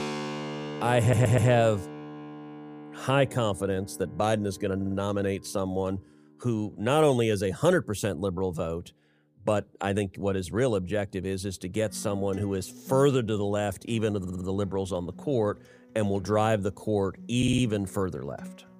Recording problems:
background music; noticeable; throughout; 15 dB below the speech
audio stuttering; 4 times, first at 1 s

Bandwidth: 15 kHz